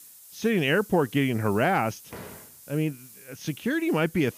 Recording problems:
high frequencies cut off; noticeable; nothing above 6.5 kHz
hiss; faint; throughout; 20 dB below the speech
door banging; faint; at 2 s; peak 15 dB below the speech

